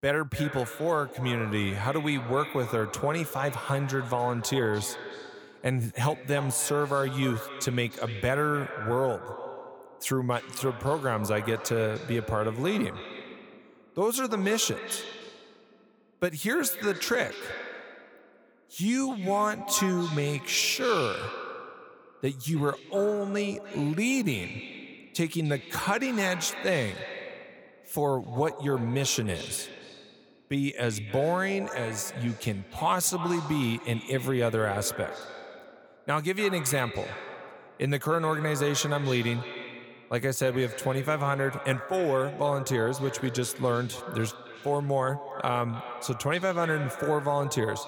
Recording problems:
echo of what is said; strong; throughout; 300 ms later, 10 dB below the speech

